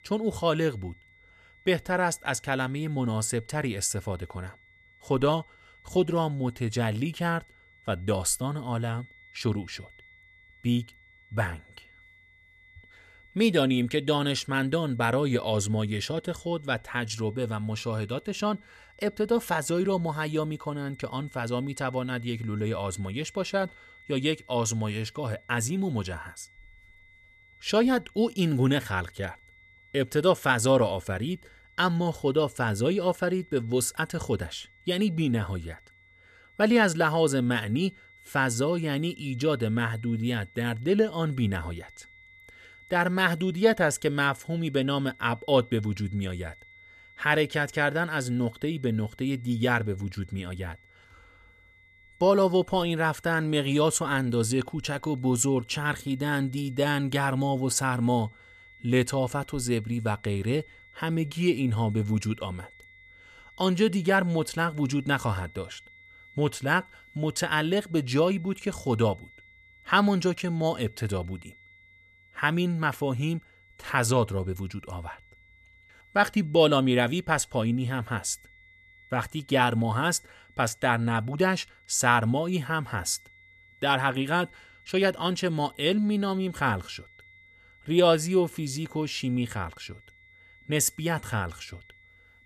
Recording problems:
high-pitched whine; faint; throughout; 2 kHz, 25 dB below the speech

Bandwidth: 14 kHz